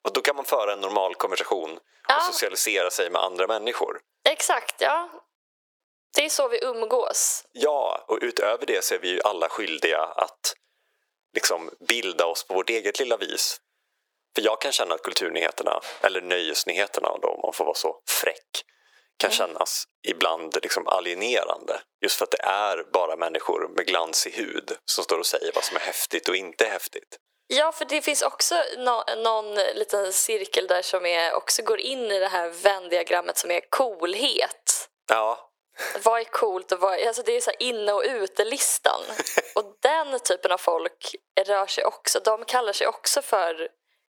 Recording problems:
thin; very; fading below 400 Hz
squashed, flat; somewhat

